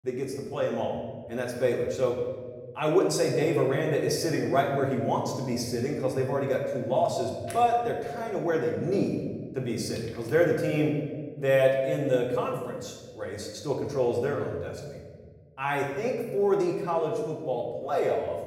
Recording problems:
off-mic speech; far
room echo; noticeable; dies away in 1.4 s

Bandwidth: 16 kHz